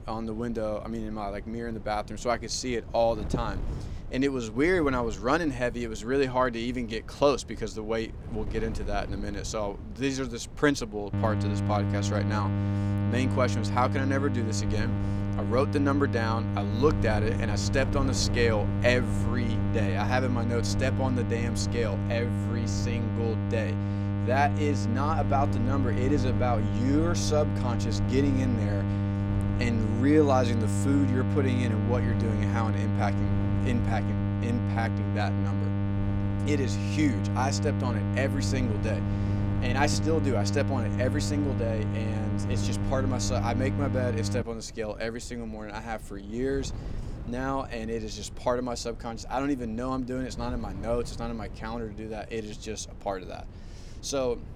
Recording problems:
electrical hum; loud; from 11 to 44 s; 50 Hz, 6 dB below the speech
wind noise on the microphone; occasional gusts; 20 dB below the speech

